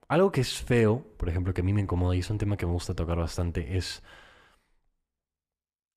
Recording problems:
none

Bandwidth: 14.5 kHz